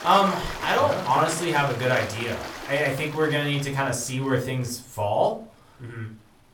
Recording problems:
room echo; very slight; dies away in 0.3 s
off-mic speech; somewhat distant
rain or running water; noticeable; throughout; 10 dB below the speech

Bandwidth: 18 kHz